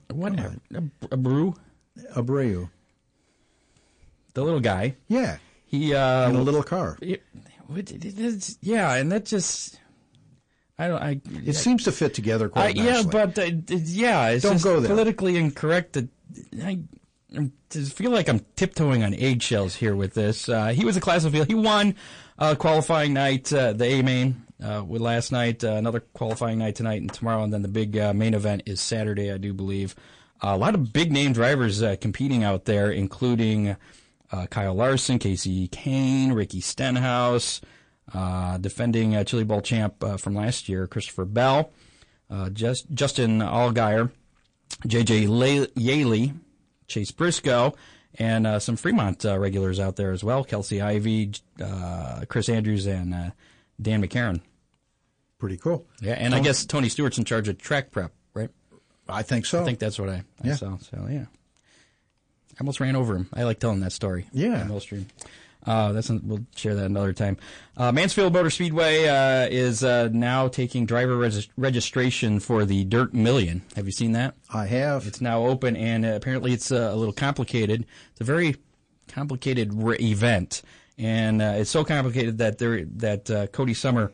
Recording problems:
distortion; slight; 10 dB below the speech
garbled, watery; slightly; nothing above 9.5 kHz

